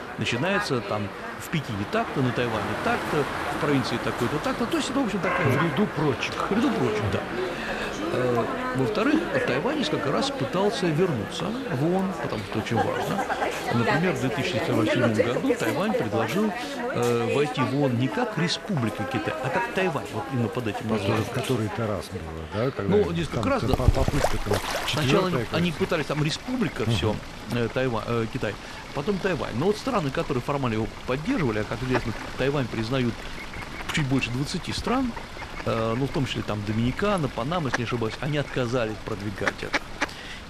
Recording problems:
animal sounds; loud; throughout; 4 dB below the speech

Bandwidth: 13.5 kHz